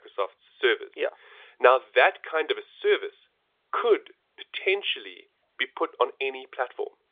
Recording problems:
phone-call audio; nothing above 3.5 kHz

